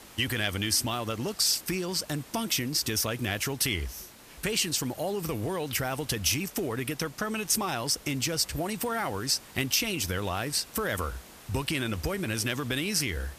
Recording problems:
hiss; noticeable; throughout; 20 dB below the speech

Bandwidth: 14.5 kHz